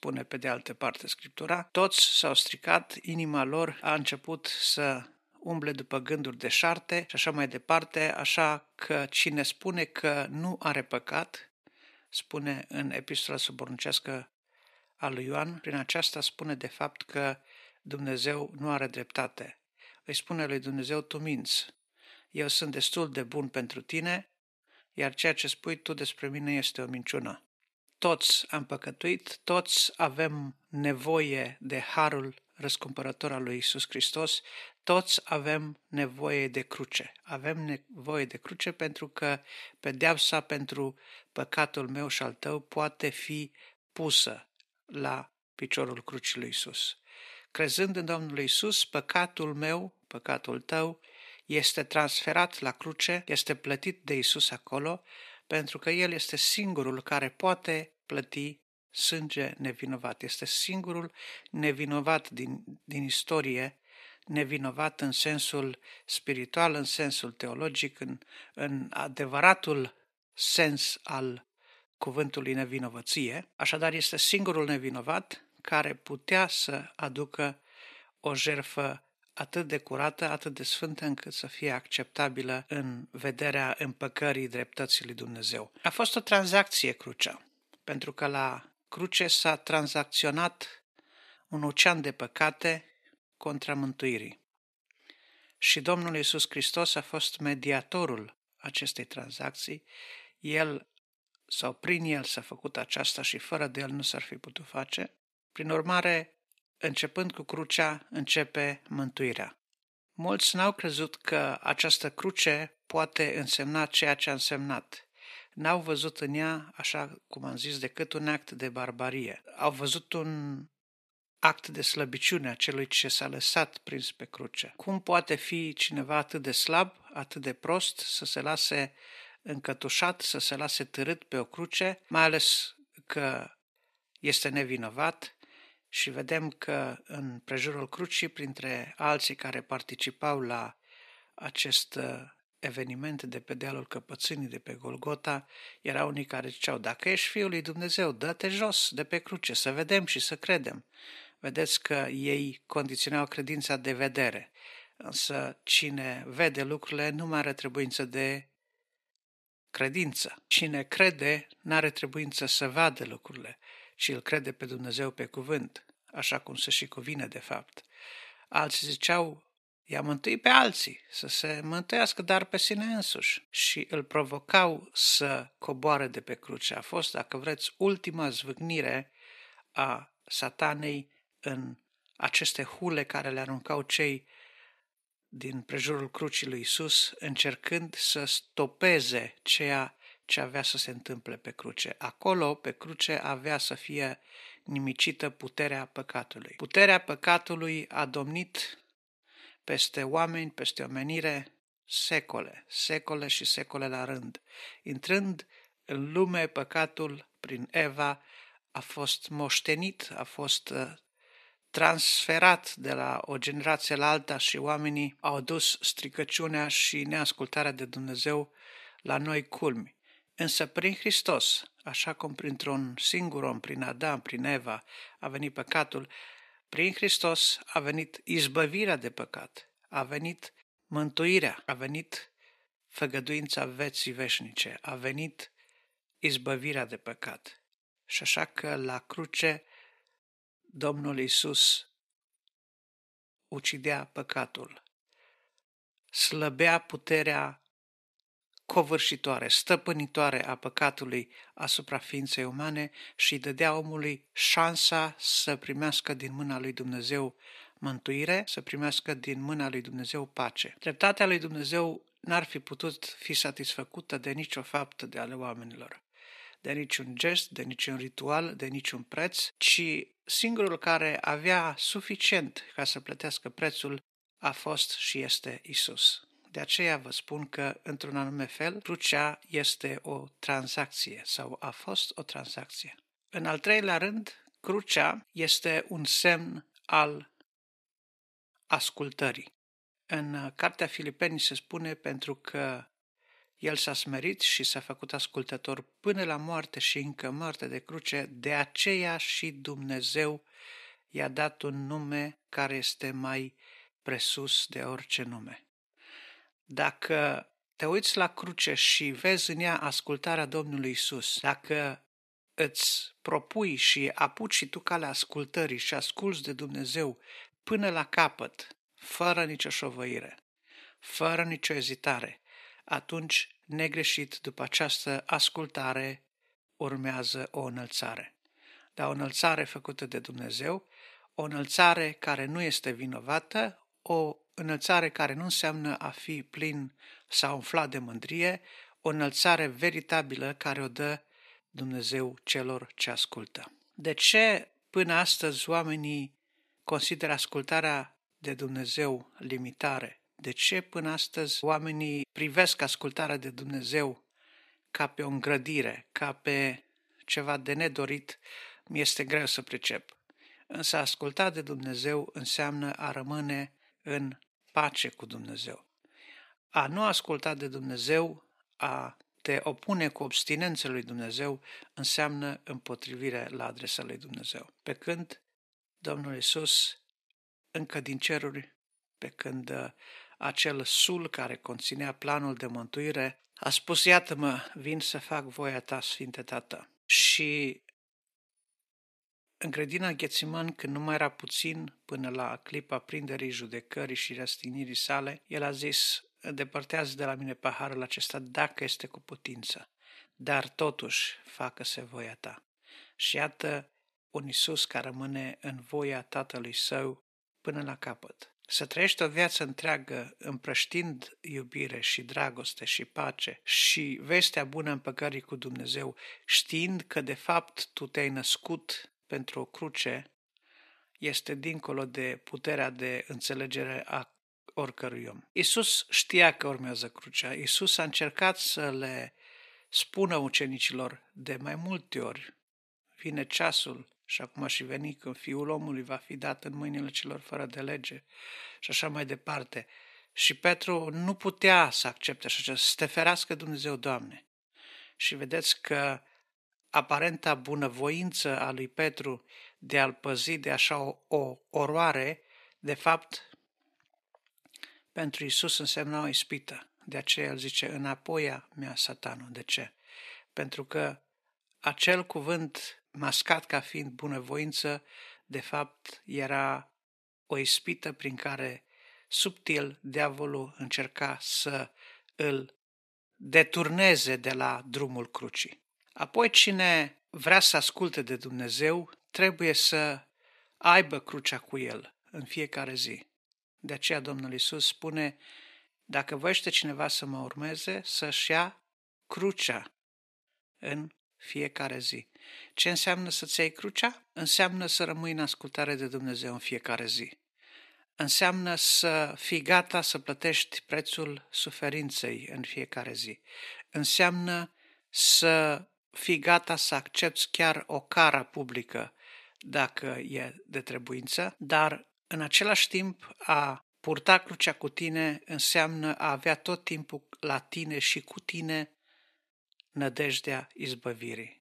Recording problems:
thin; somewhat; fading below 350 Hz

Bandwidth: 13.5 kHz